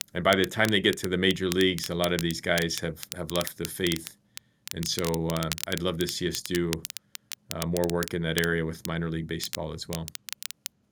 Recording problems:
crackle, like an old record; loud; 10 dB below the speech

